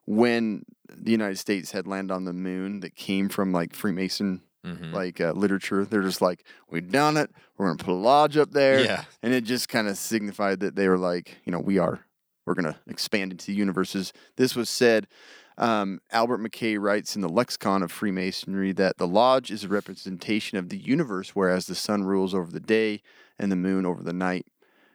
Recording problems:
uneven, jittery; strongly; from 2 to 24 s

